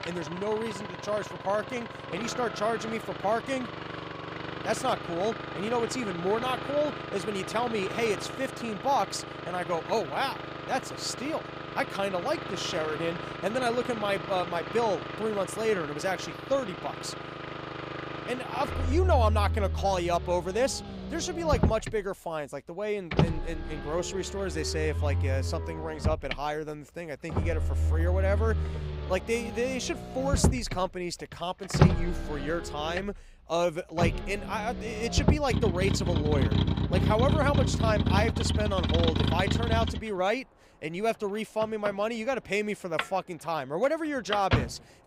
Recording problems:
traffic noise; loud; throughout; 1 dB below the speech

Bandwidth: 15.5 kHz